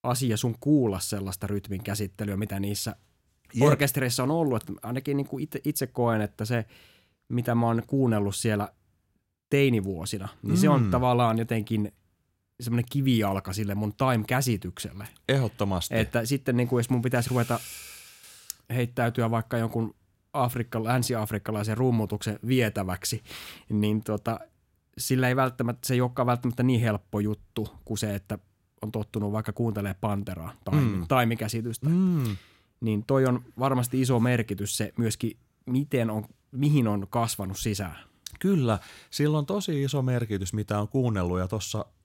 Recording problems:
none

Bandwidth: 16 kHz